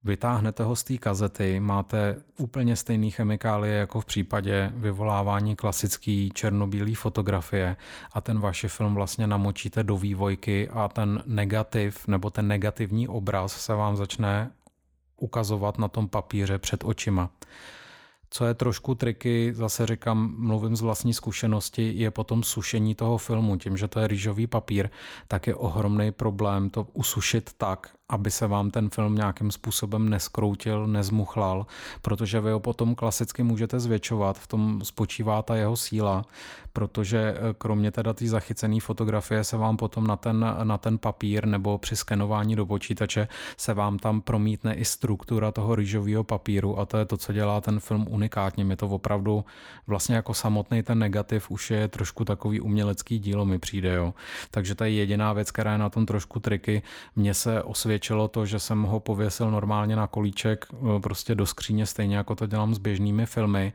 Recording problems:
none

